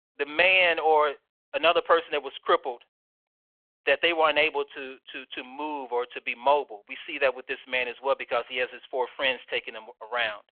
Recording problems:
phone-call audio

